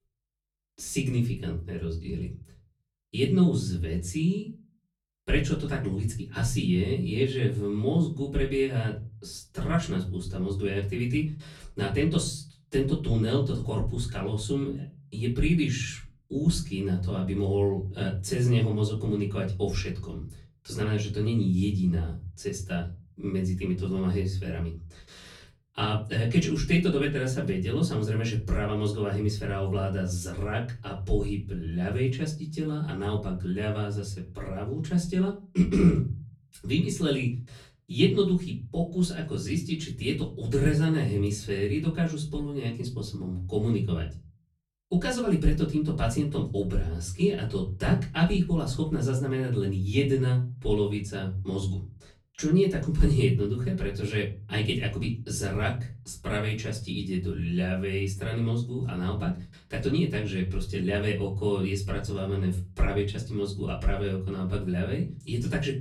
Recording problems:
off-mic speech; far
room echo; very slight; dies away in 0.3 s

